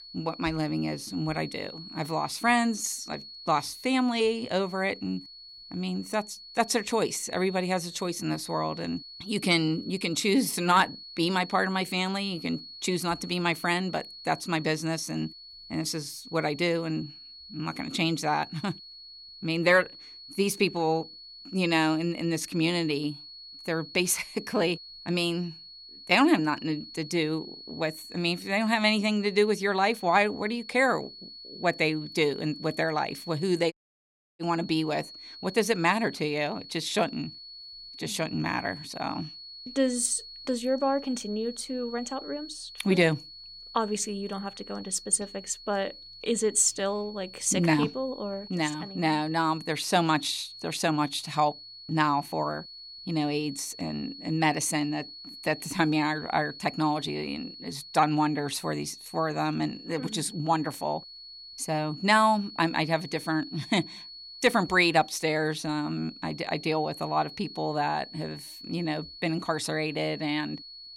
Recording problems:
high-pitched whine; noticeable; throughout; 4.5 kHz, 15 dB below the speech
audio cutting out; at 34 s for 0.5 s

